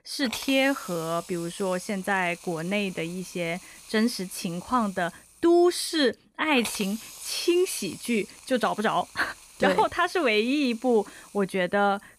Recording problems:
hiss; noticeable; throughout; 15 dB below the speech

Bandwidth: 14.5 kHz